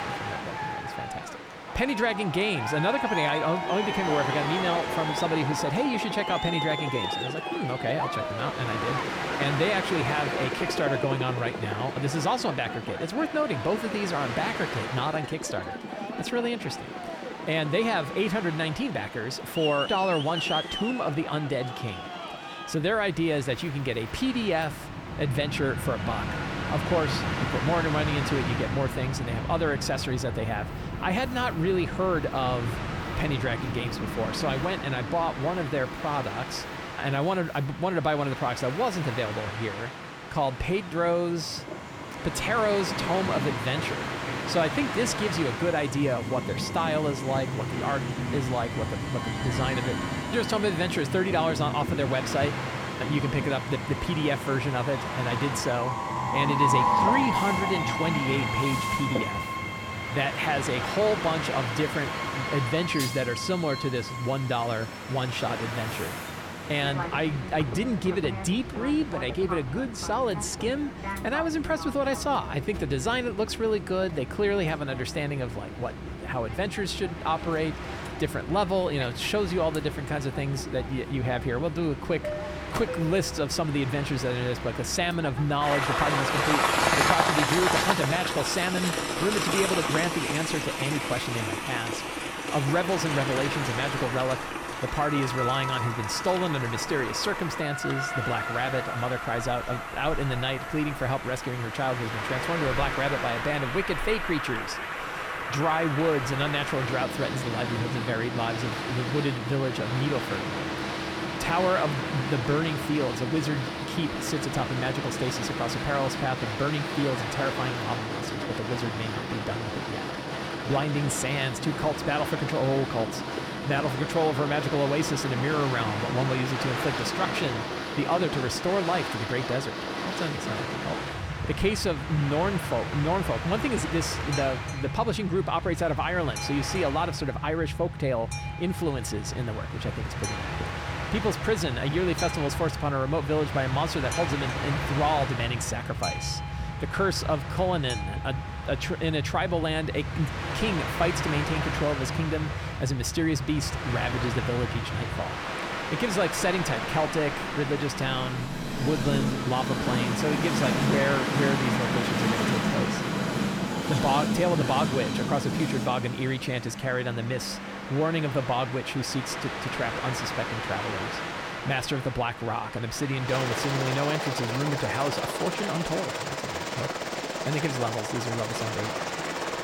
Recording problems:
train or aircraft noise; loud; throughout; 2 dB below the speech

